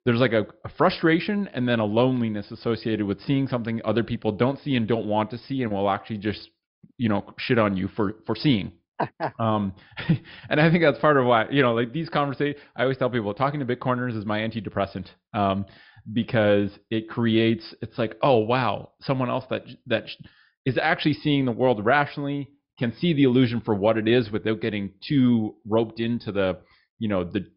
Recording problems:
high frequencies cut off; noticeable; nothing above 5.5 kHz

